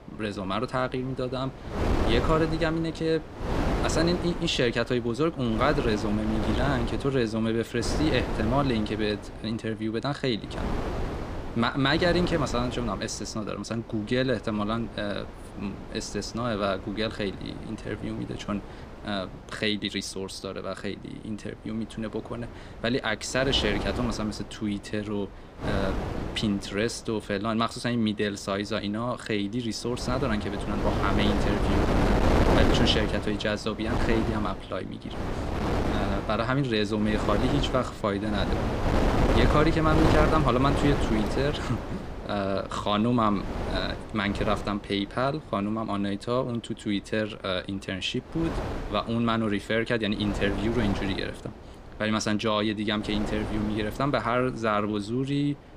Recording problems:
wind noise on the microphone; heavy; 4 dB below the speech

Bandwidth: 15 kHz